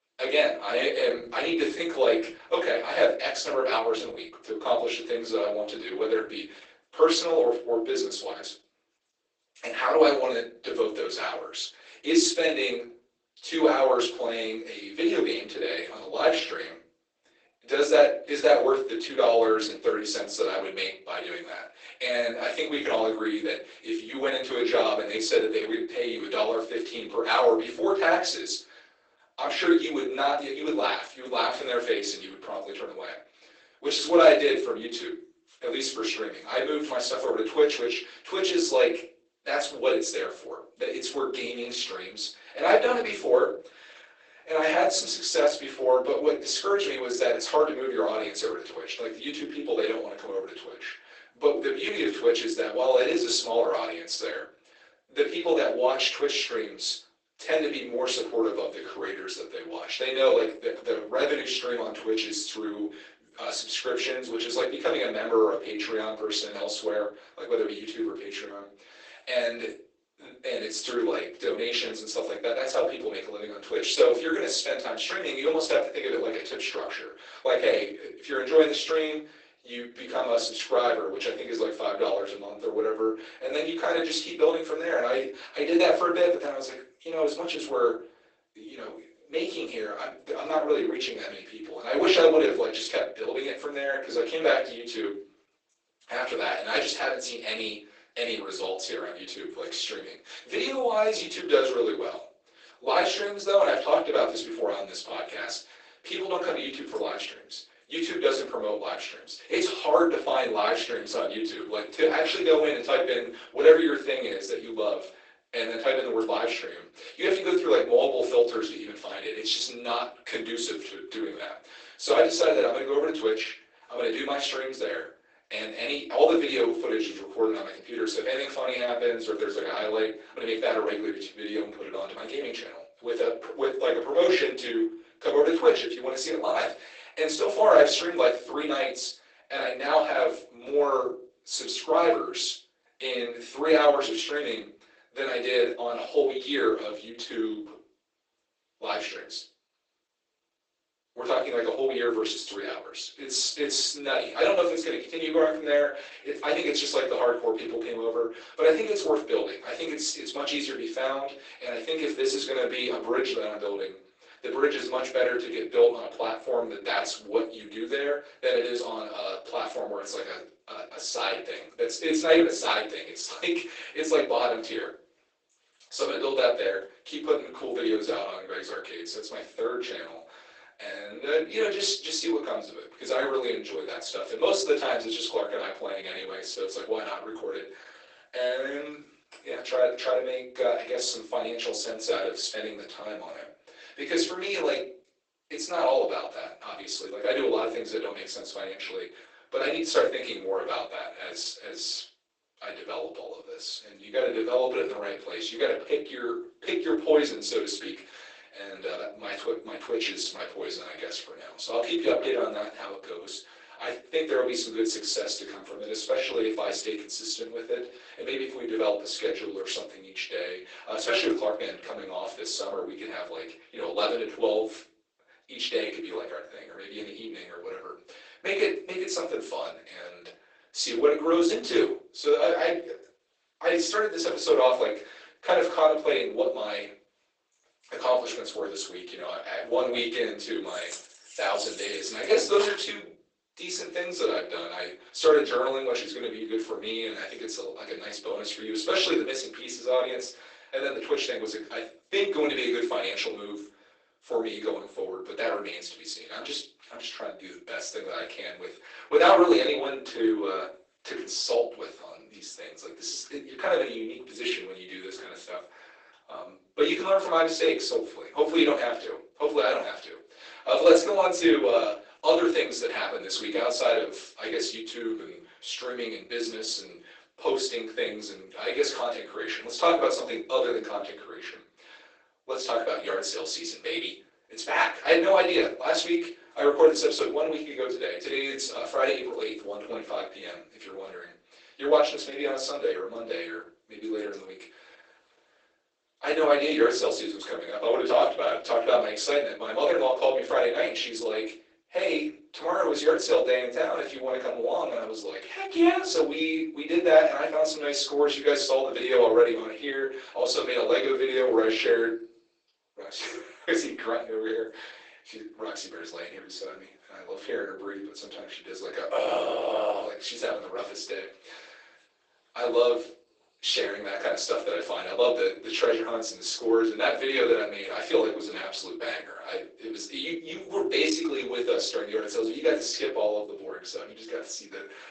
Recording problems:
off-mic speech; far
garbled, watery; badly; nothing above 8 kHz
thin; very; fading below 350 Hz
room echo; slight; dies away in 0.3 s
jangling keys; noticeable; from 4:01 to 4:03; peak 8 dB below the speech

